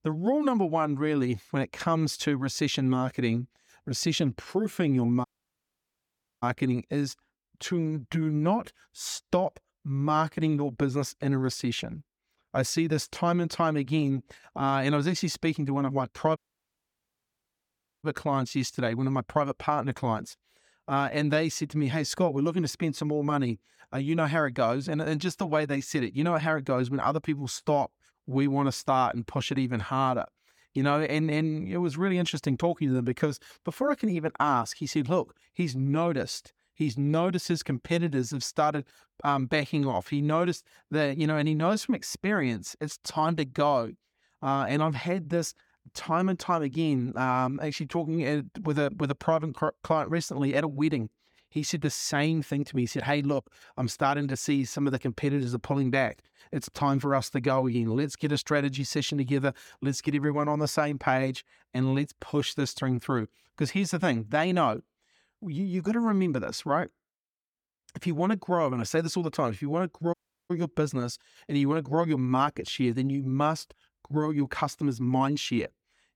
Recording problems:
audio cutting out; at 5.5 s for 1 s, at 16 s for 1.5 s and at 1:10

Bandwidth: 18 kHz